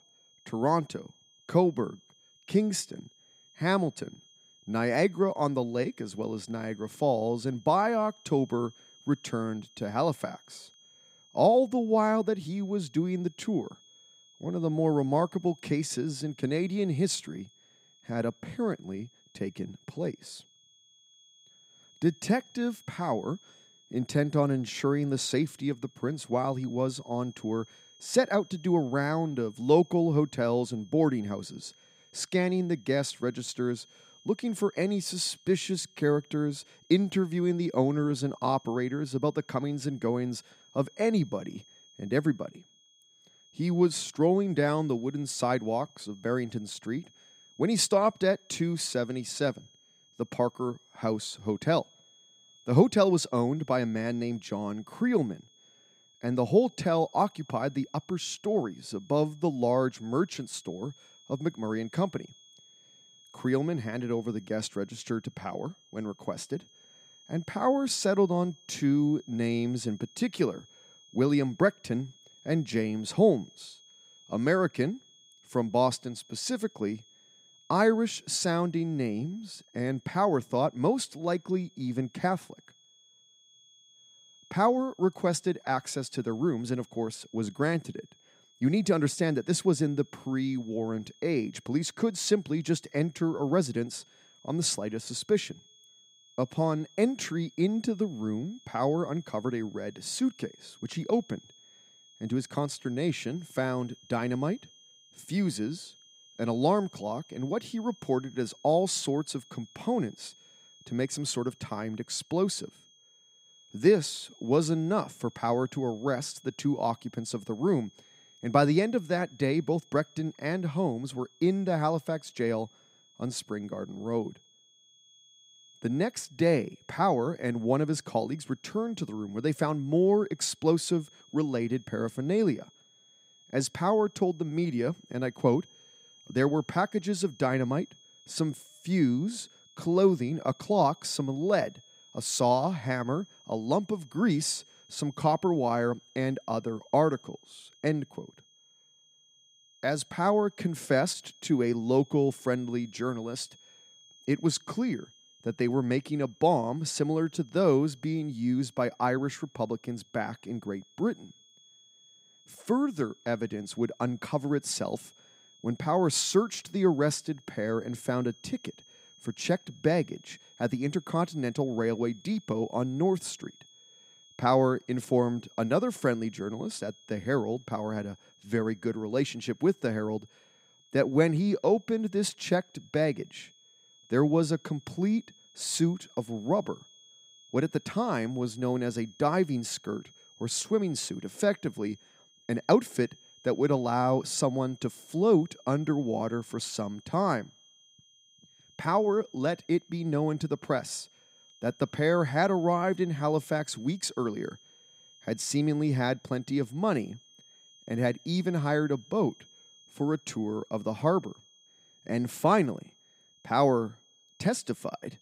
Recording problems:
high-pitched whine; faint; throughout; 3.5 kHz, 30 dB below the speech

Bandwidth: 15.5 kHz